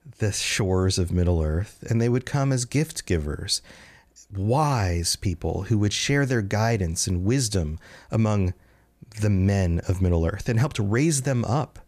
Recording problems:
none

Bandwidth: 14.5 kHz